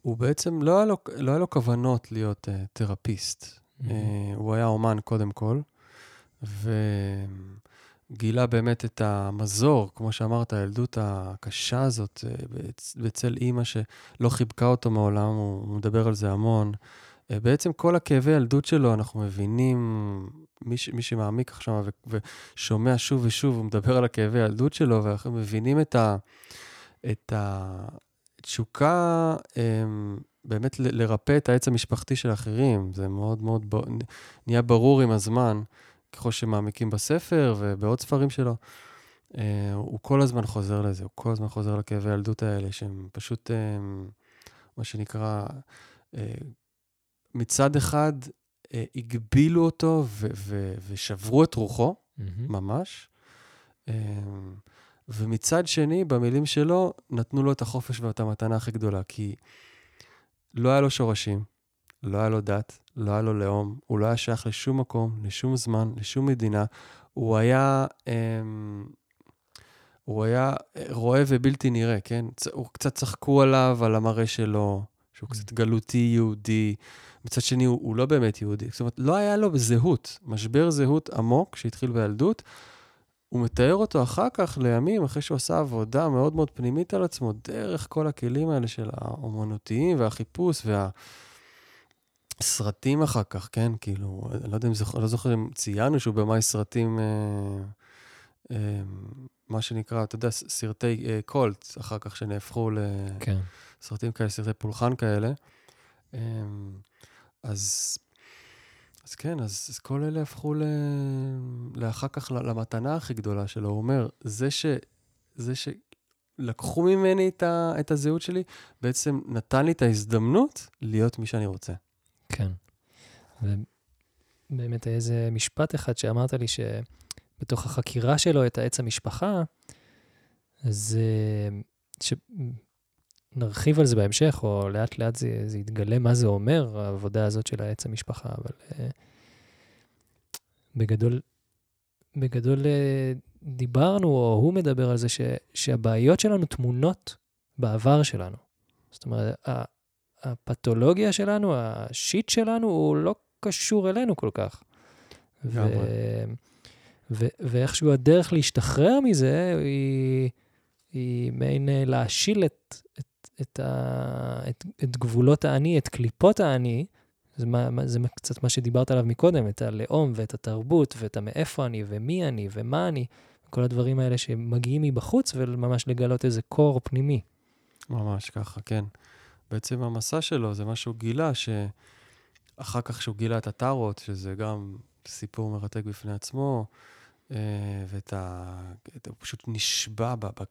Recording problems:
none

